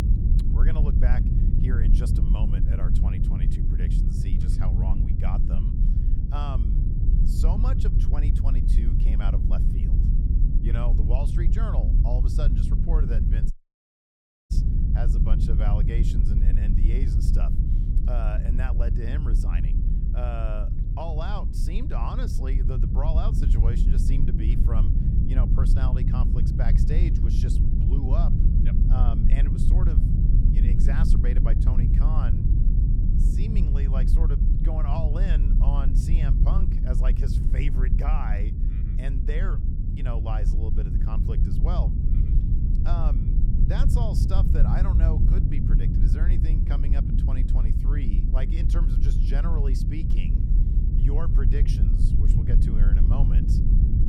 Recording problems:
low rumble; loud; throughout; as loud as the speech
audio cutting out; at 14 s for 1 s

